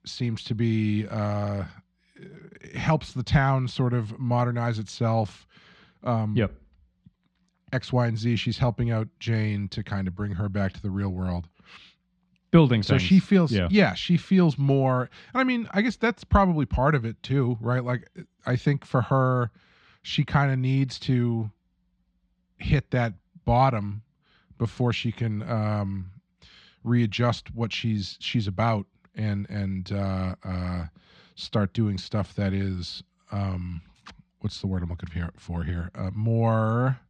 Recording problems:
muffled; very slightly; fading above 4 kHz

